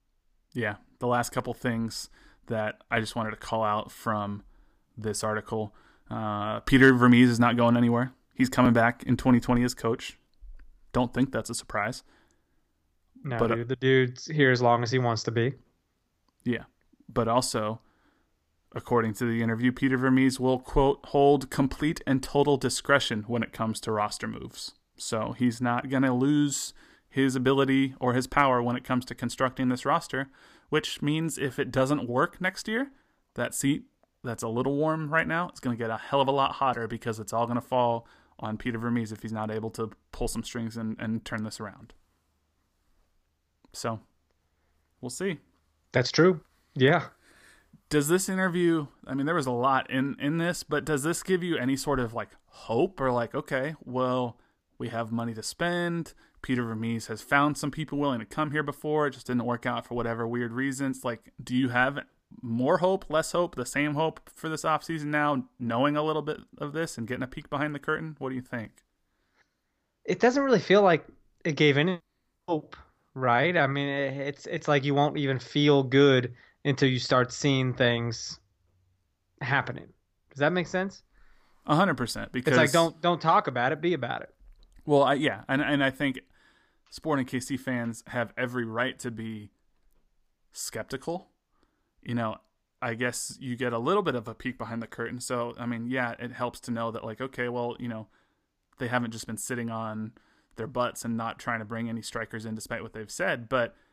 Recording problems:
none

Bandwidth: 15 kHz